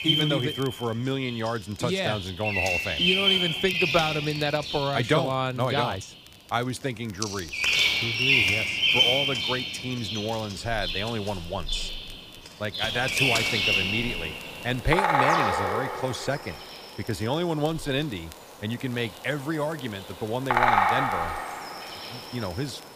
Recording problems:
animal sounds; very loud; throughout; 5 dB above the speech
crackle, like an old record; faint; 25 dB below the speech
uneven, jittery; slightly; from 3.5 to 19 s

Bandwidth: 15 kHz